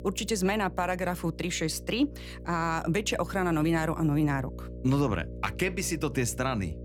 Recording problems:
electrical hum; noticeable; throughout; 60 Hz, 20 dB below the speech

